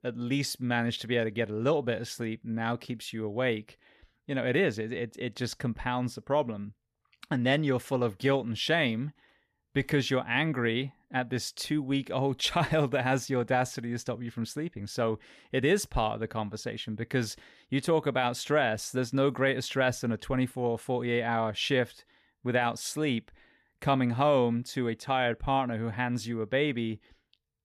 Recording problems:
none

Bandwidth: 14.5 kHz